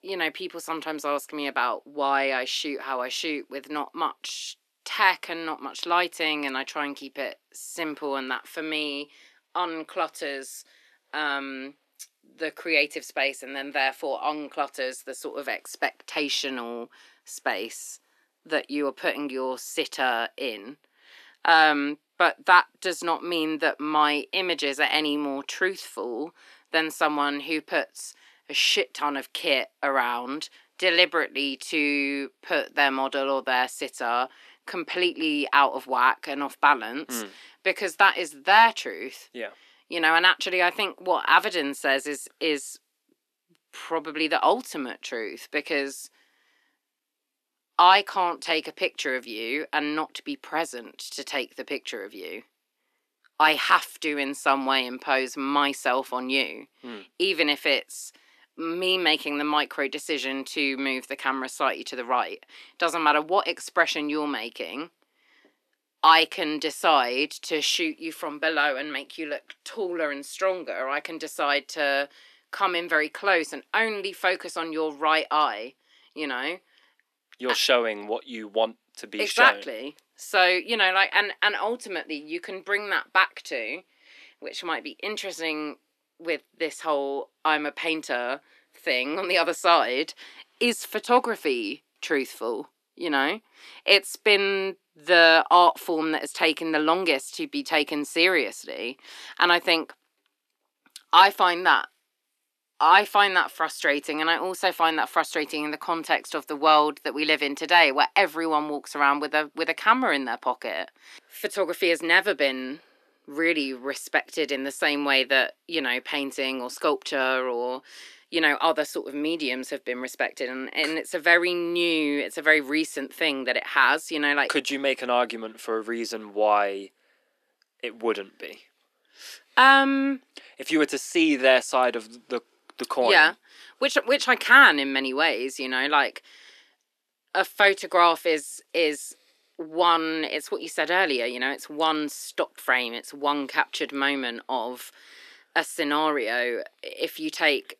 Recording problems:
thin; very slightly; fading below 250 Hz

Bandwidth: 13.5 kHz